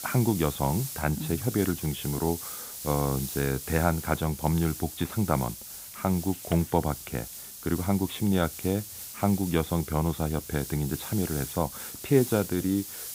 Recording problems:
high frequencies cut off; severe; nothing above 4 kHz
hiss; loud; throughout; 9 dB below the speech

